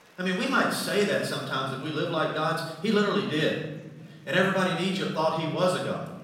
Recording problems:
off-mic speech; far
room echo; noticeable; dies away in 1.2 s
murmuring crowd; faint; throughout; 25 dB below the speech

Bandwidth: 16 kHz